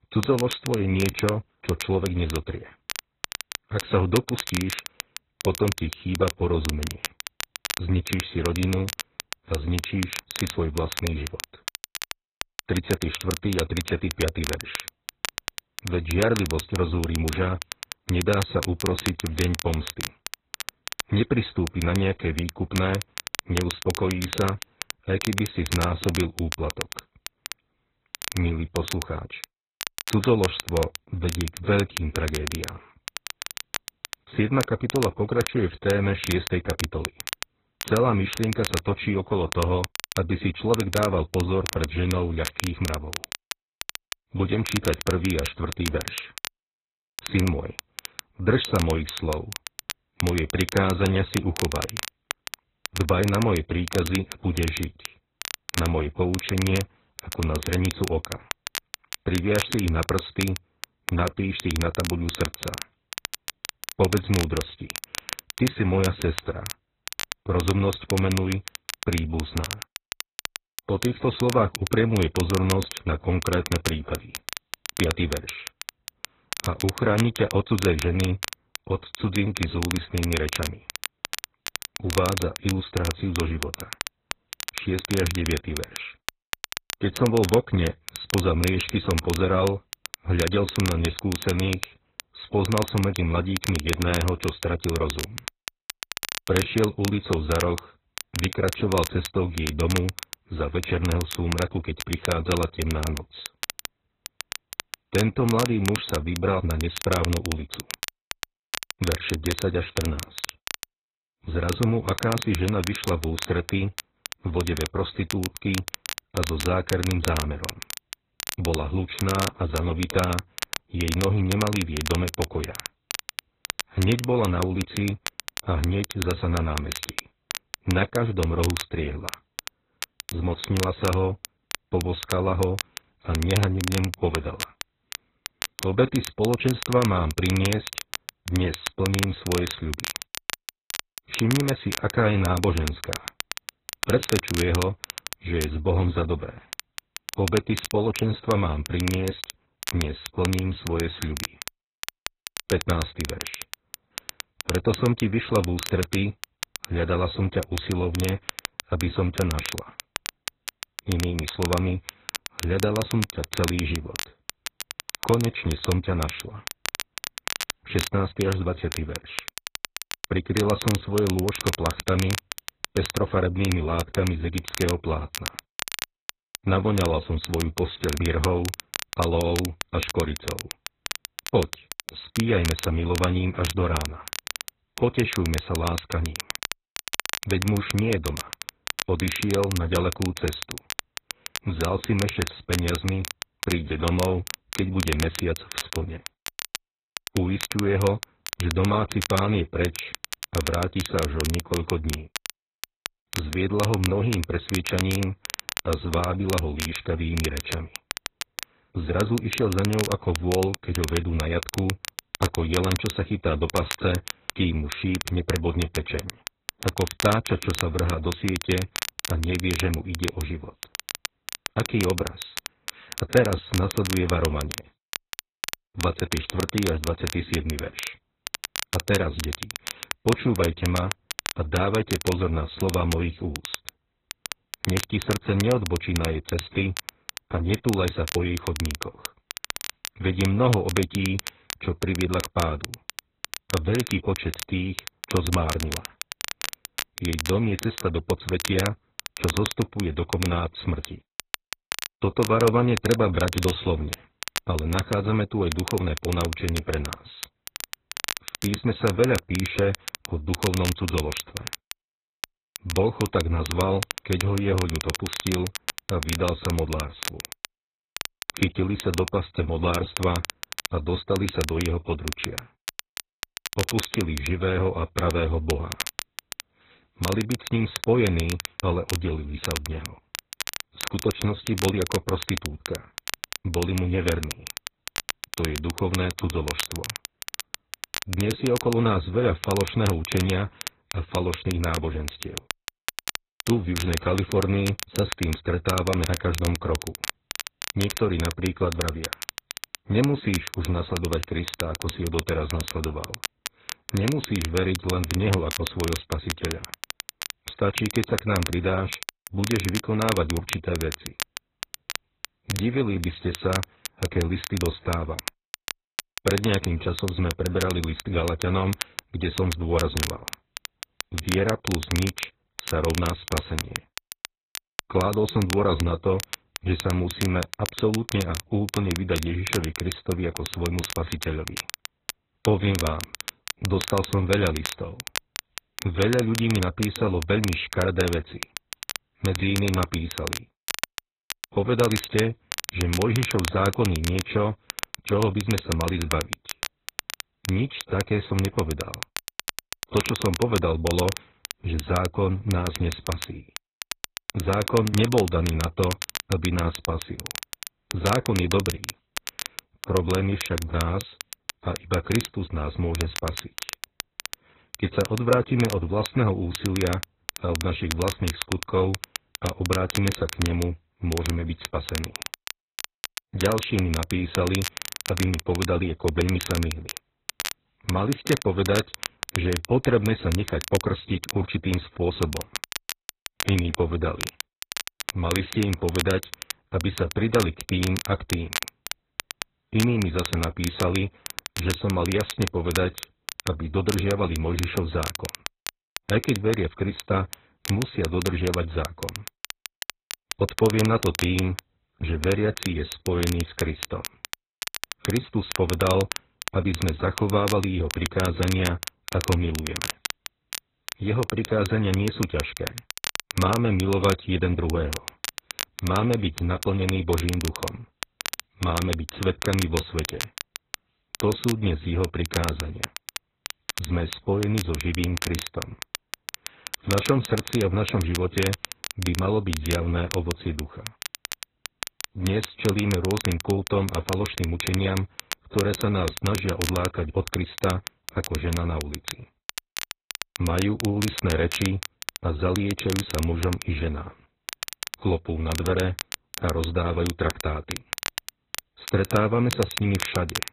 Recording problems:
garbled, watery; badly
high frequencies cut off; severe; nothing above 4 kHz
crackle, like an old record; loud; 8 dB below the speech

